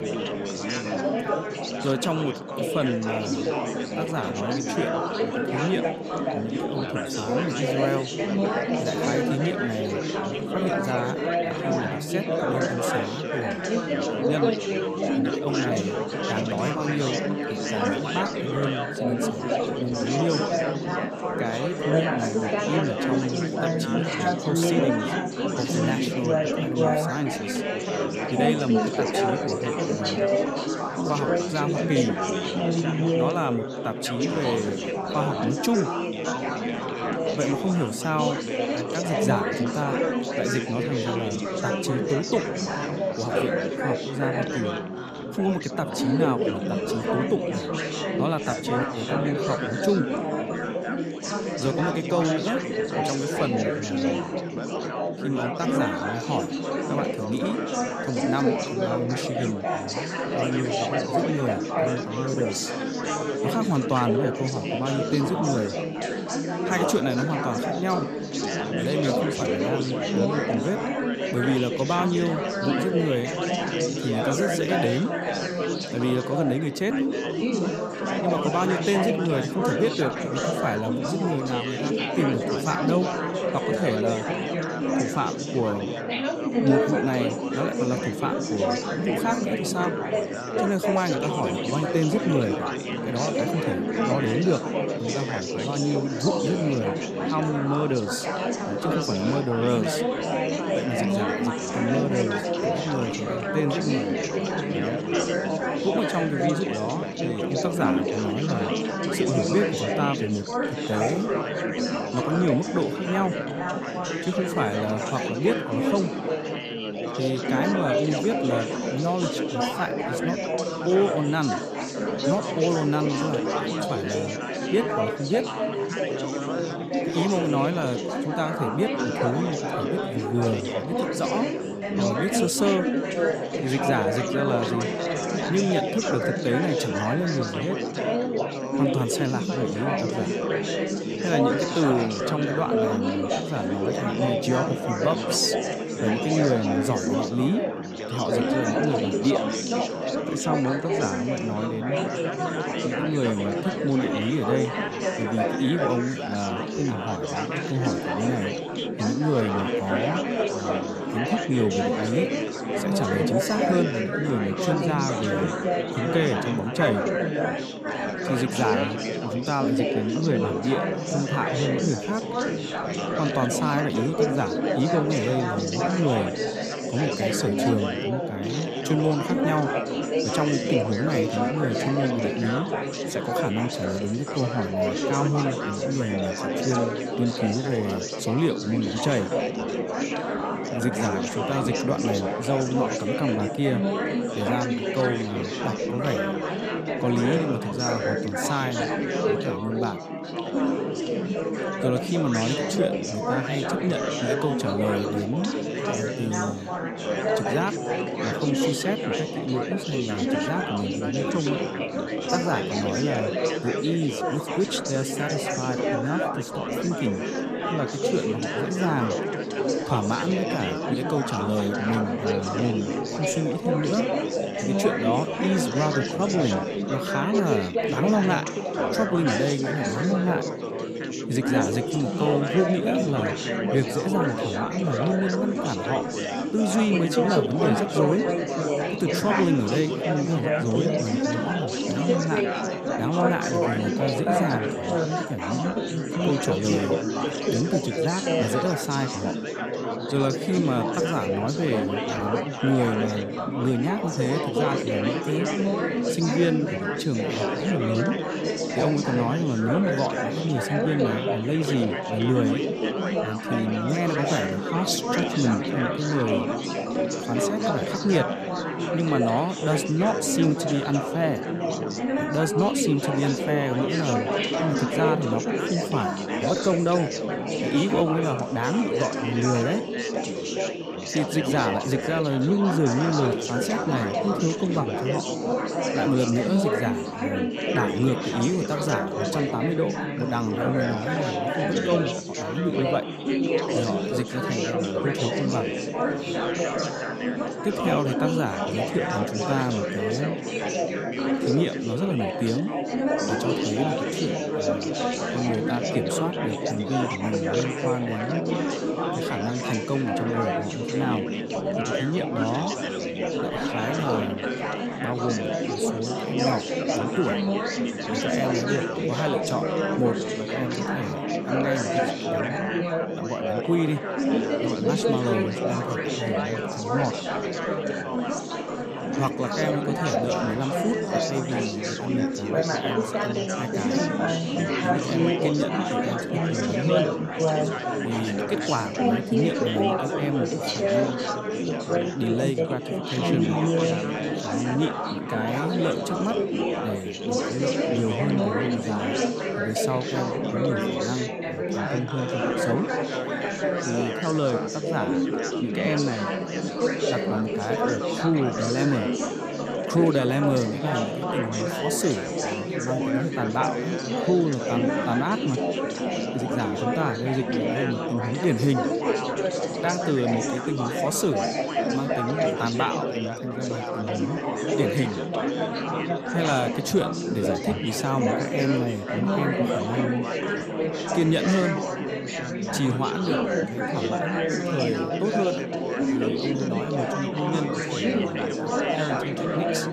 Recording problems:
chatter from many people; very loud; throughout; 1 dB above the speech

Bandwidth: 15 kHz